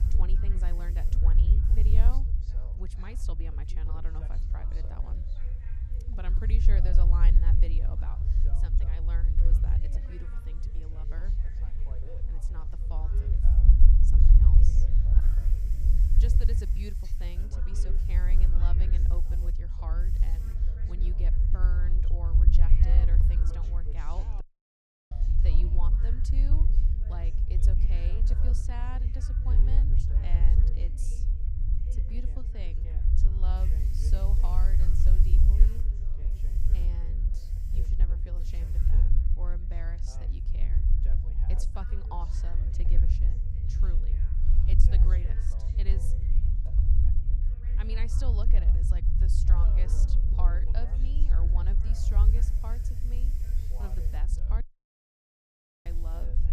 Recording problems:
background chatter; loud; throughout; 2 voices, 9 dB below the speech
low rumble; loud; throughout; as loud as the speech
hiss; noticeable; throughout; 15 dB below the speech
household noises; faint; until 18 s; 25 dB below the speech
audio cutting out; at 24 s for 0.5 s and at 55 s for 1.5 s

